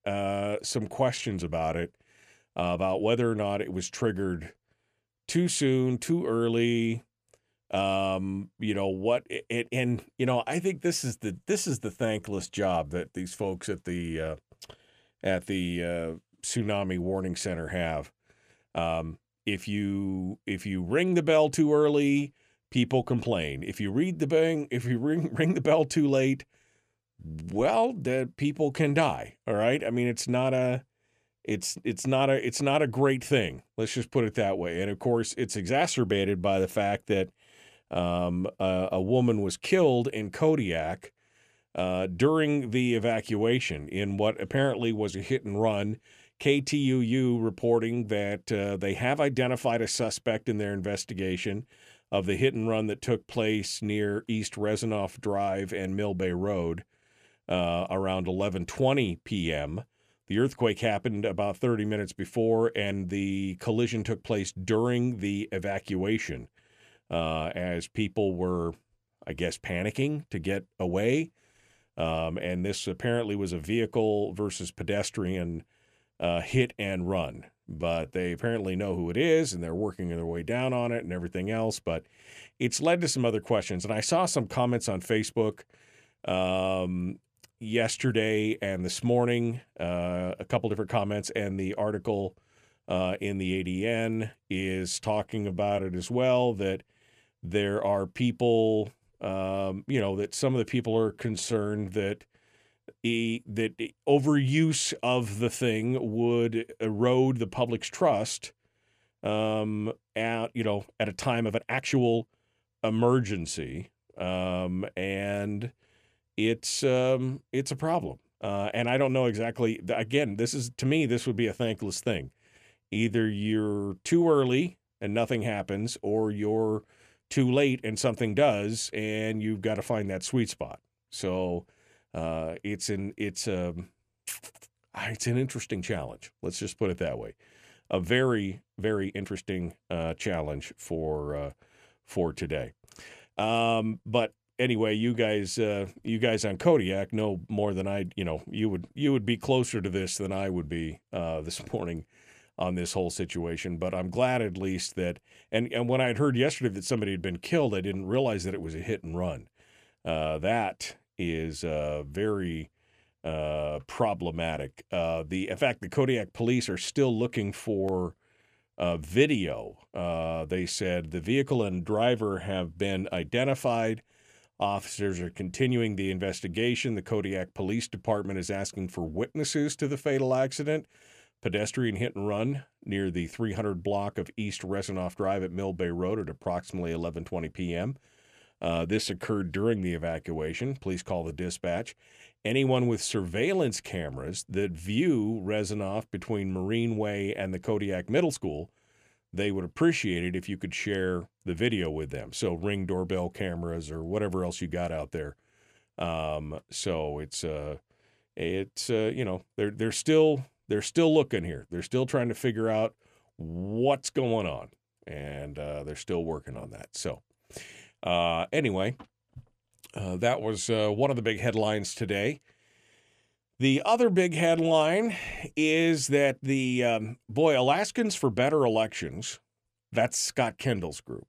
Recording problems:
uneven, jittery; strongly; from 12 s to 3:45

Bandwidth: 14.5 kHz